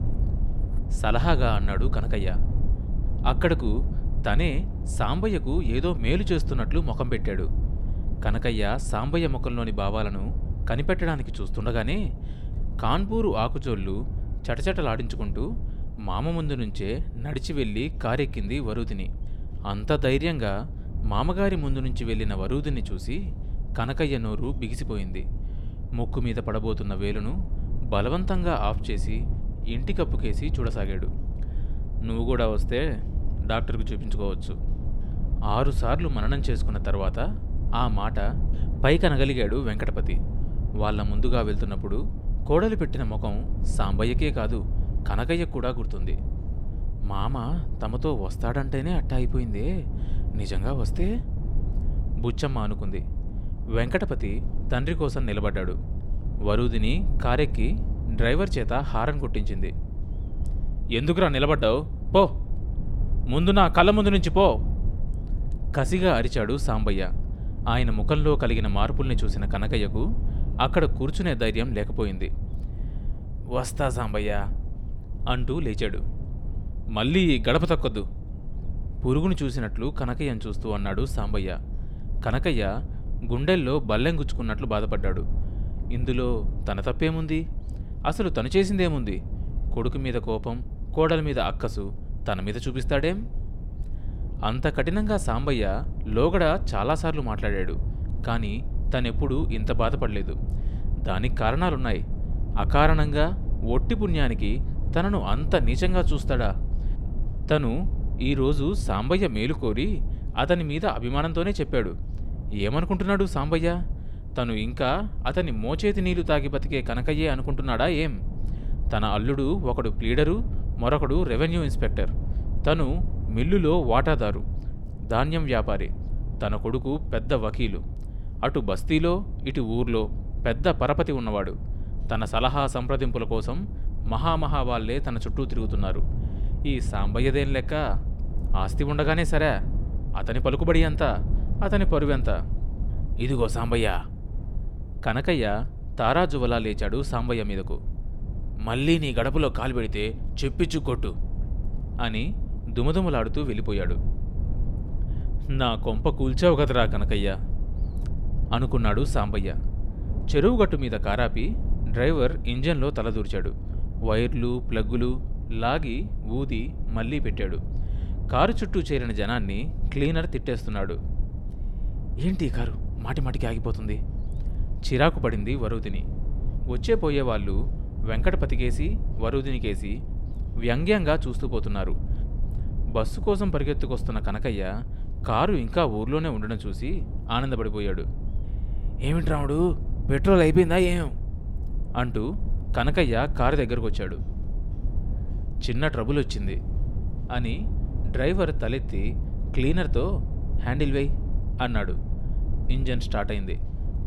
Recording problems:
low rumble; noticeable; throughout; 20 dB below the speech

